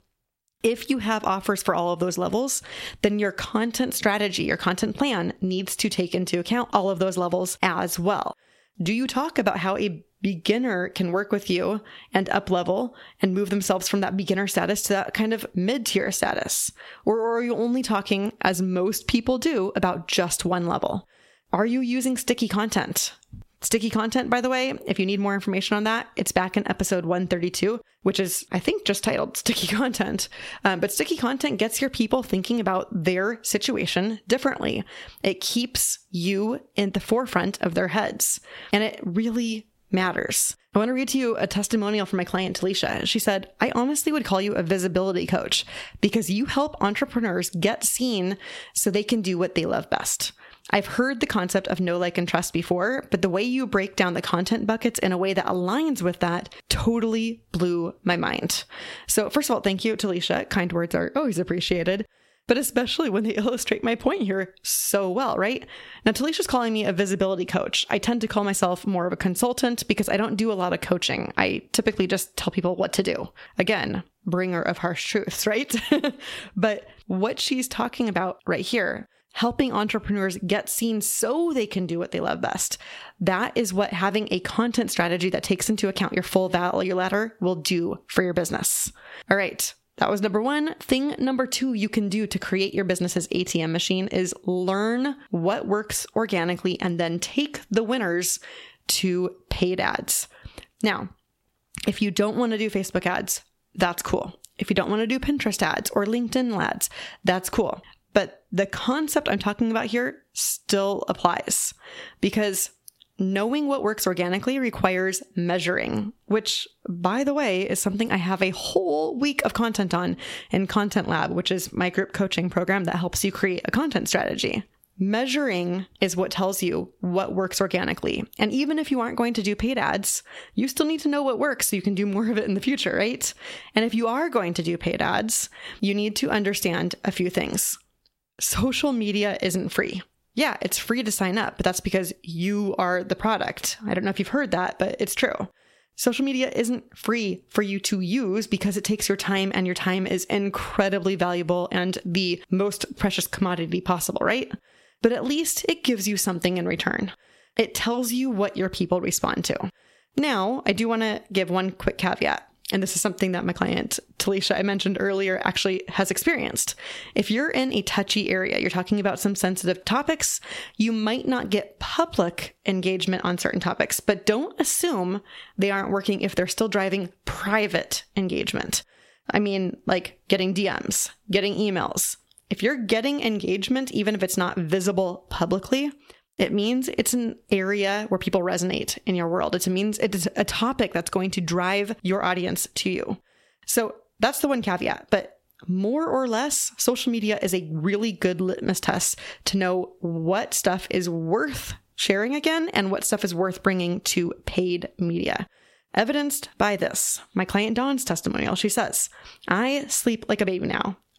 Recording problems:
squashed, flat; somewhat

